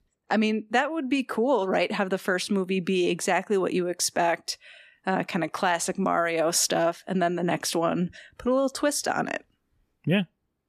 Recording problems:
none

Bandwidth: 14.5 kHz